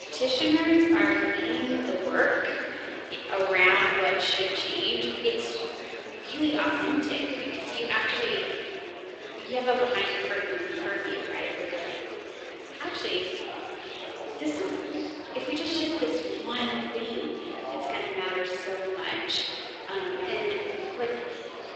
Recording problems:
off-mic speech; far
room echo; noticeable; dies away in 2.4 s
thin; somewhat; fading below 350 Hz
garbled, watery; slightly; nothing above 7.5 kHz
murmuring crowd; noticeable; throughout; 10 dB below the speech

